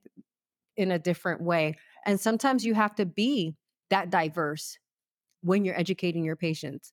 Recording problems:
none

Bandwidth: 18.5 kHz